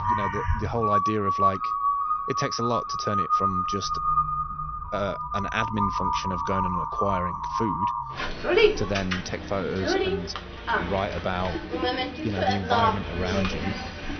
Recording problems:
high frequencies cut off; noticeable; nothing above 6 kHz
animal sounds; very loud; throughout; 4 dB above the speech

